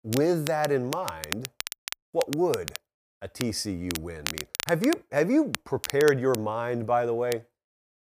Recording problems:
crackle, like an old record; loud; 9 dB below the speech

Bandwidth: 15 kHz